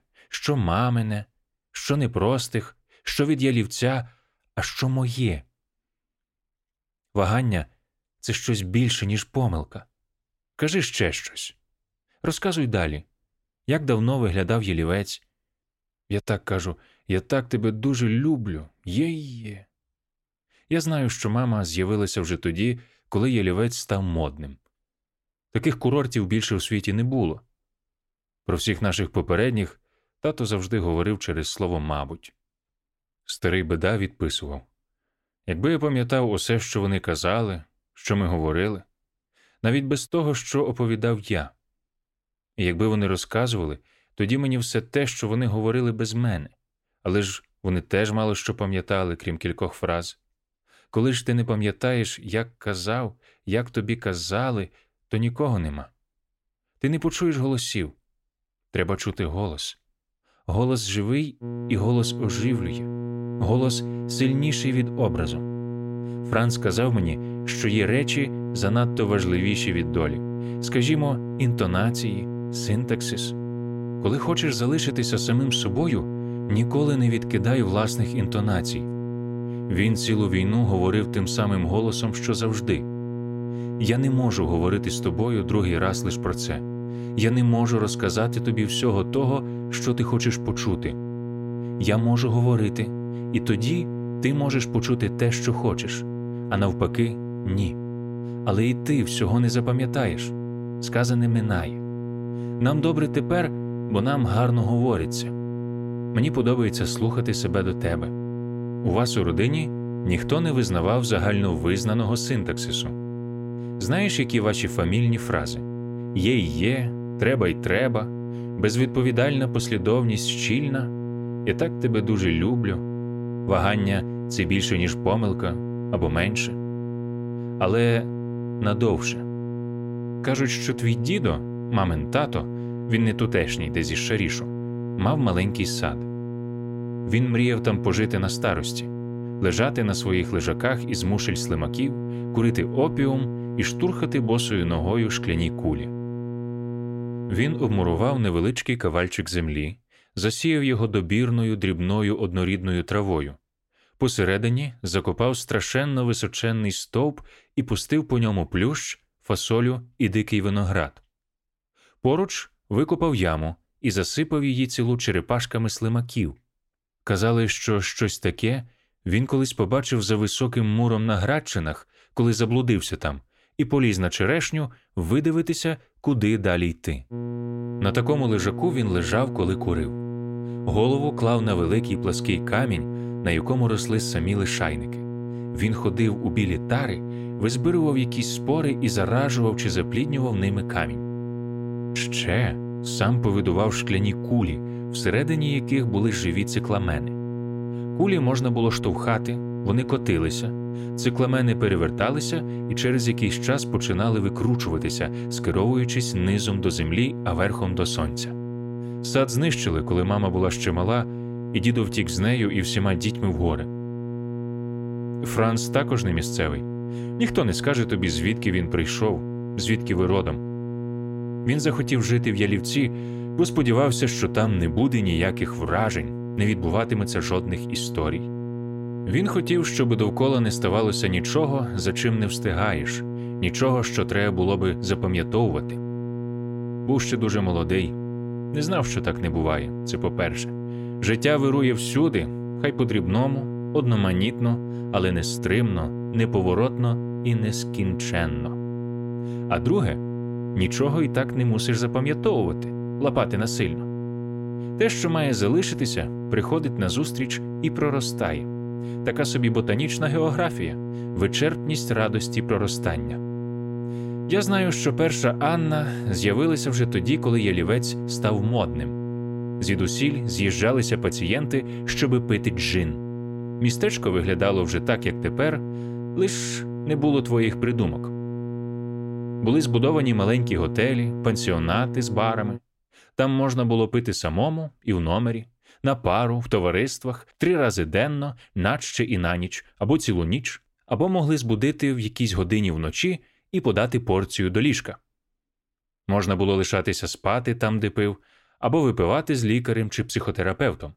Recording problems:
electrical hum; loud; from 1:01 to 2:28 and from 2:57 to 4:43; 60 Hz, 9 dB below the speech

